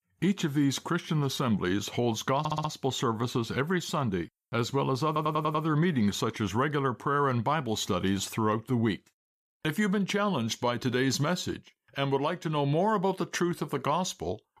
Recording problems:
audio stuttering; at 2.5 s and at 5 s

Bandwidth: 14.5 kHz